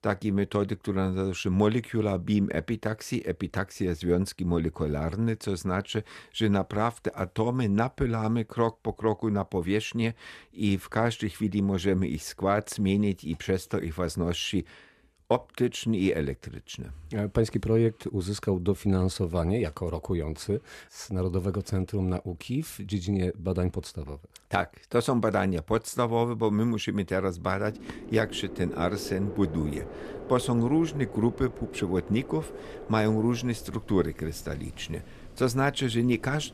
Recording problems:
wind in the background; noticeable; from 28 s on; 15 dB below the speech

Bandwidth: 14 kHz